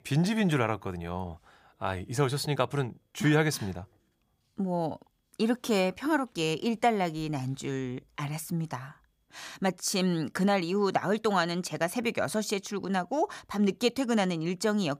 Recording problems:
none

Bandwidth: 15 kHz